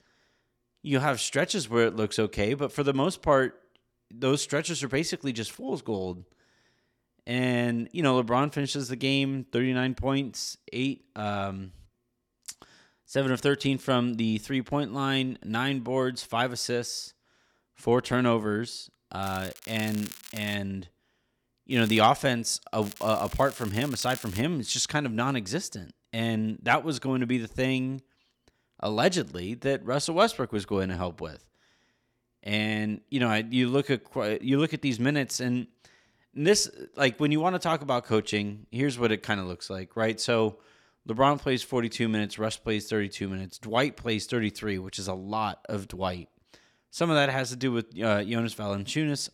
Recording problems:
crackling; noticeable; from 19 to 21 s, at 22 s and from 23 to 24 s; 15 dB below the speech

